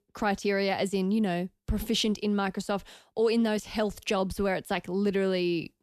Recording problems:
none

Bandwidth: 14.5 kHz